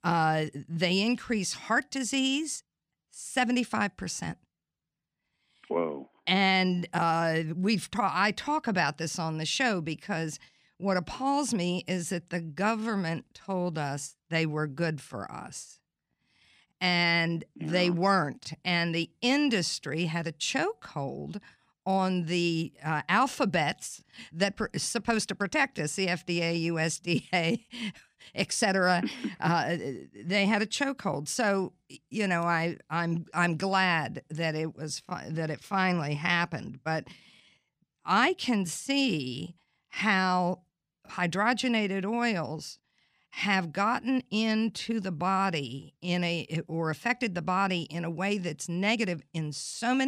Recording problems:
abrupt cut into speech; at the end

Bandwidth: 15 kHz